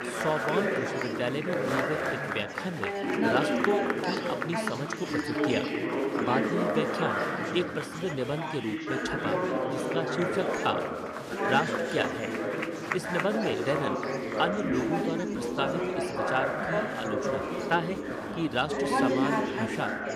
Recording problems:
chatter from many people; very loud; throughout; 3 dB above the speech

